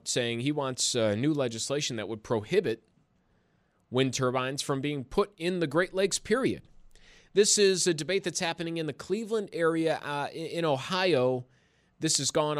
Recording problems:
abrupt cut into speech; at the end

